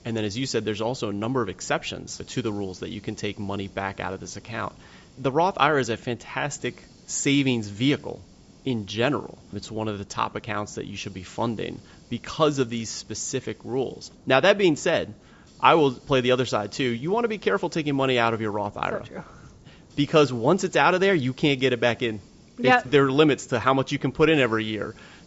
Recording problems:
high frequencies cut off; noticeable; nothing above 8 kHz
hiss; faint; throughout; 25 dB below the speech

